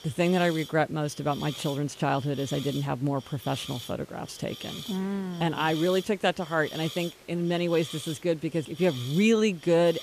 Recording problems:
hiss; noticeable; throughout; 15 dB below the speech

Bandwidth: 14.5 kHz